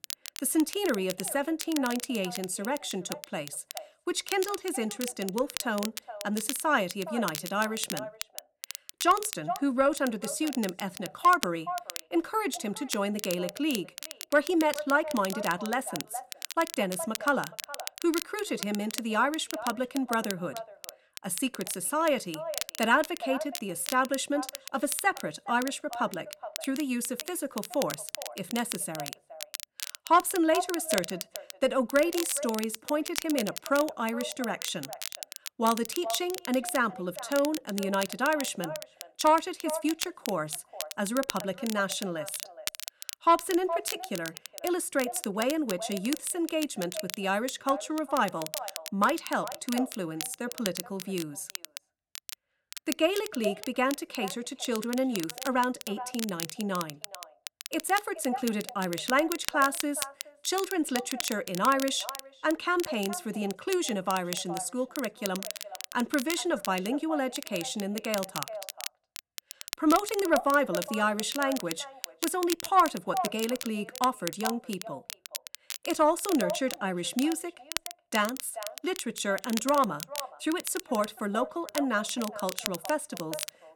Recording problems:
echo of what is said; noticeable; throughout; 420 ms later, 15 dB below the speech
crackle, like an old record; loud; 10 dB below the speech
uneven, jittery; slightly; from 9.5 to 53 s

